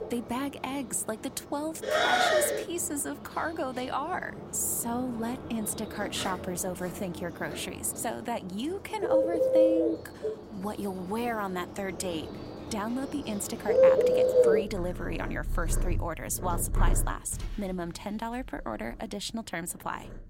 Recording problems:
animal sounds; very loud; throughout; 4 dB above the speech

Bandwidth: 16 kHz